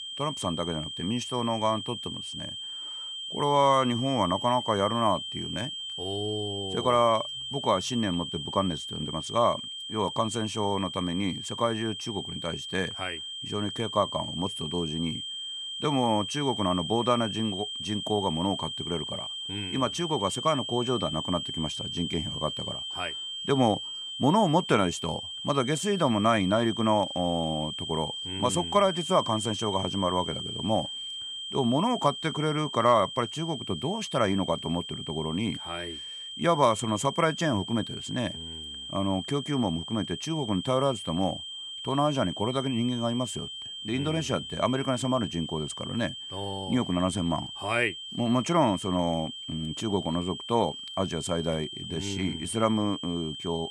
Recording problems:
high-pitched whine; loud; throughout; 3 kHz, 6 dB below the speech

